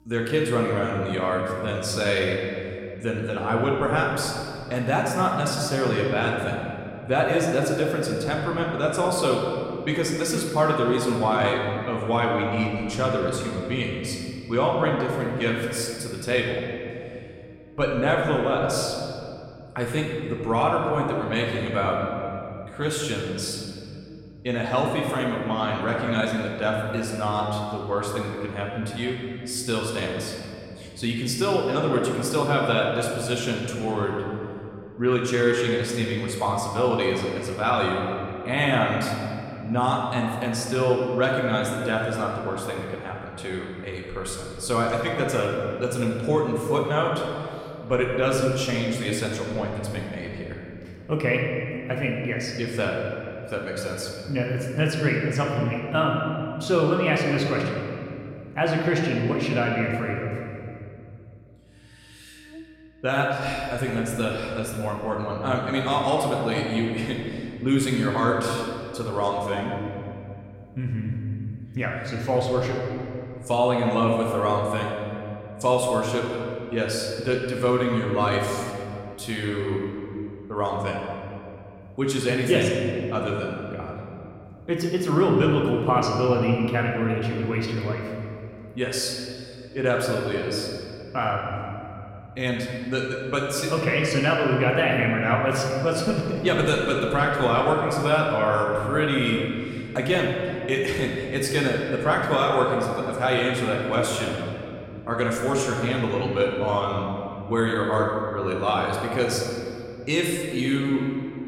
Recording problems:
room echo; noticeable; dies away in 2.4 s
off-mic speech; somewhat distant
electrical hum; faint; throughout; 60 Hz, 30 dB below the speech

